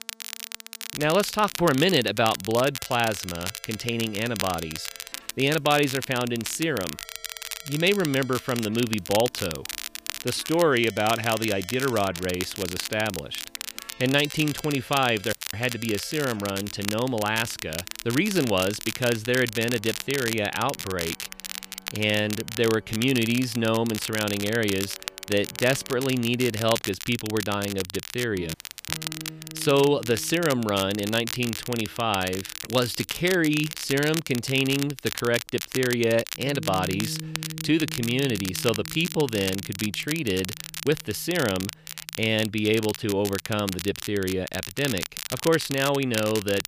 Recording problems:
crackle, like an old record; loud; 8 dB below the speech
background music; noticeable; throughout; 20 dB below the speech
audio cutting out; at 15 s and at 29 s

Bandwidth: 15 kHz